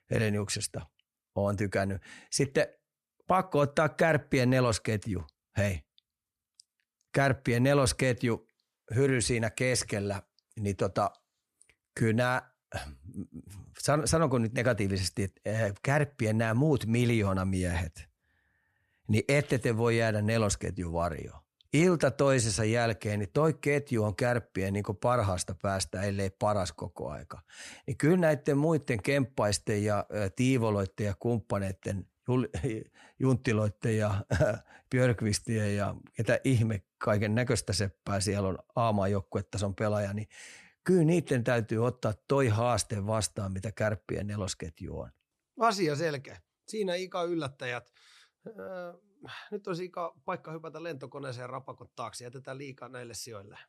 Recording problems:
none

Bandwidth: 13.5 kHz